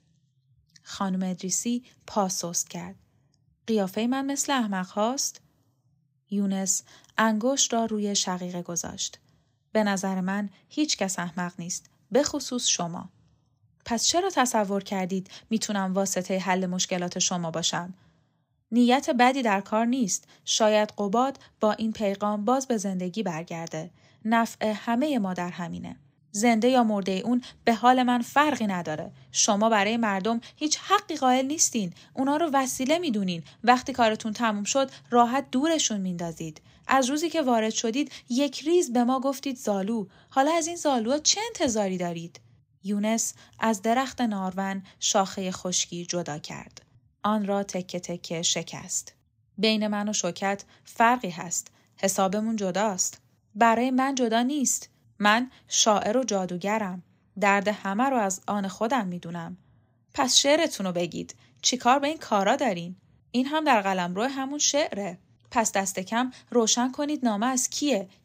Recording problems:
none

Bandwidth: 15.5 kHz